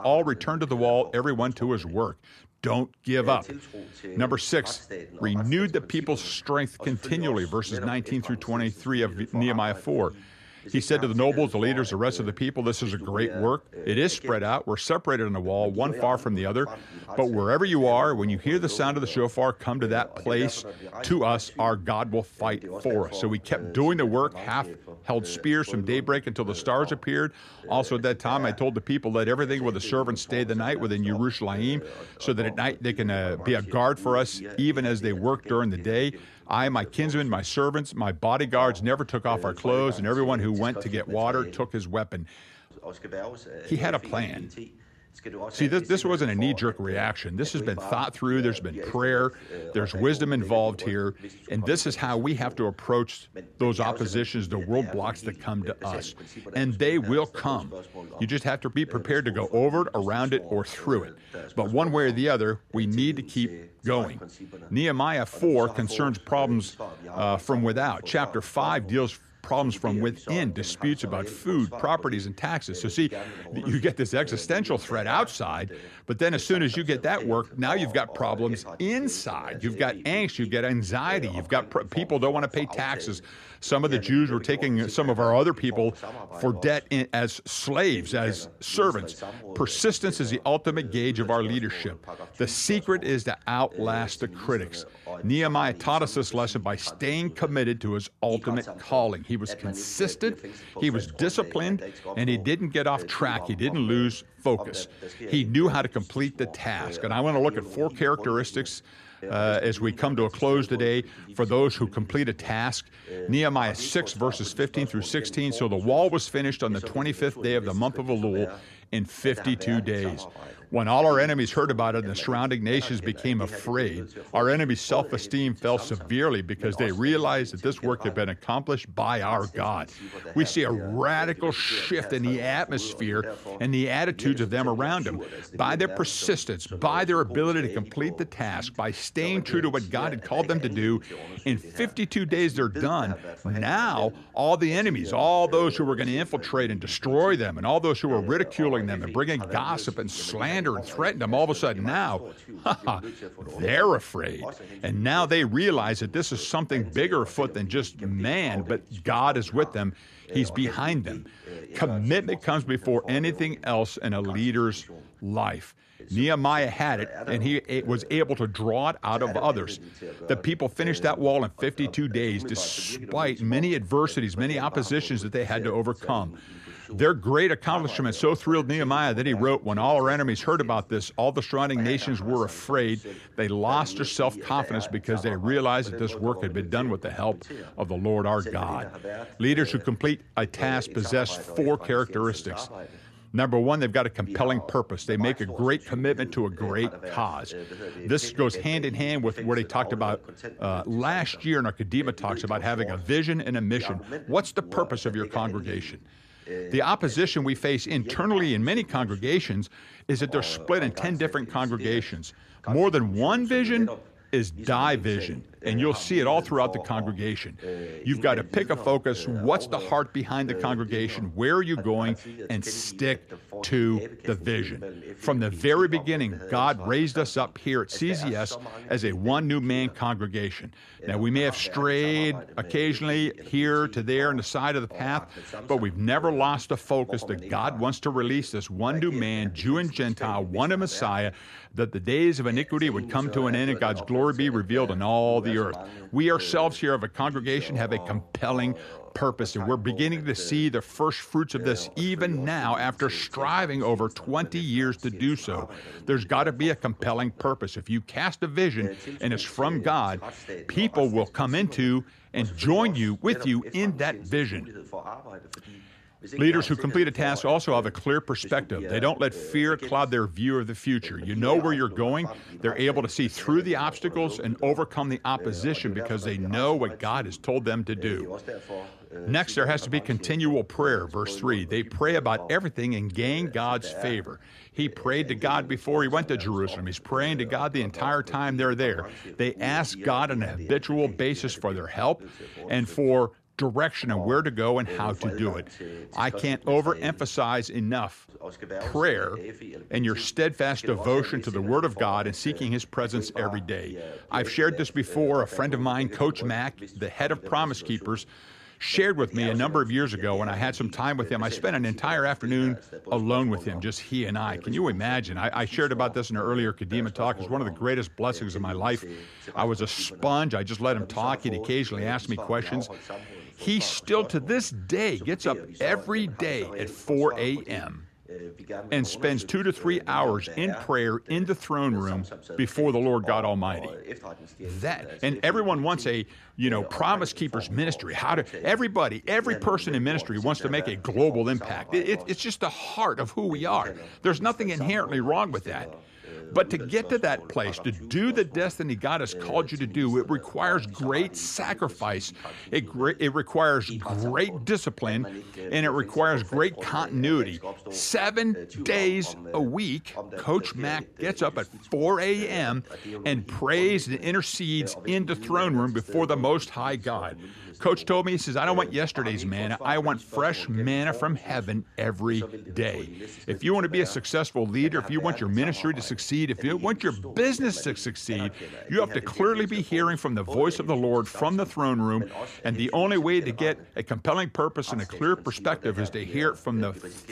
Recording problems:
voice in the background; noticeable; throughout; 15 dB below the speech

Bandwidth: 14 kHz